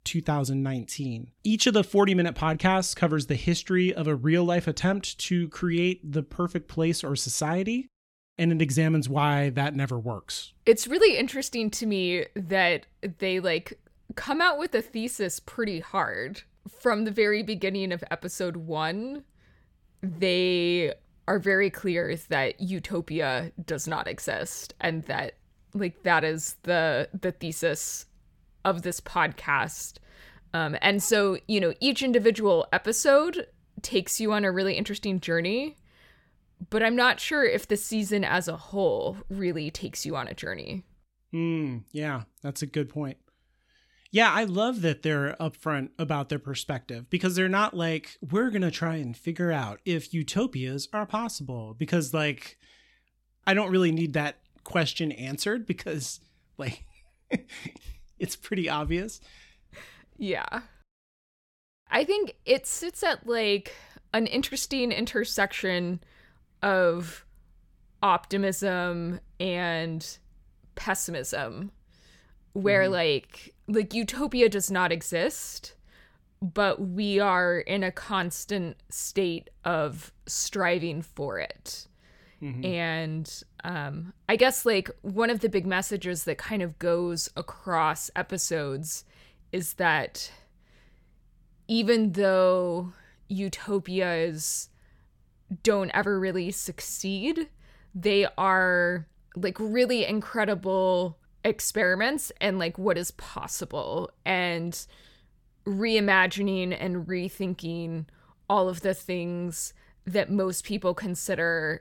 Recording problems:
none

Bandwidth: 17 kHz